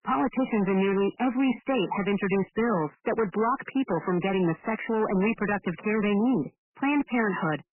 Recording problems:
garbled, watery; badly; nothing above 3 kHz
distortion; slight; 15% of the sound clipped

